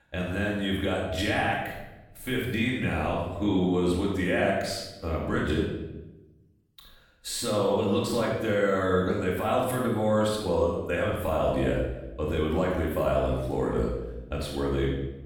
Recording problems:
off-mic speech; far
room echo; noticeable; dies away in 0.8 s

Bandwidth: 18.5 kHz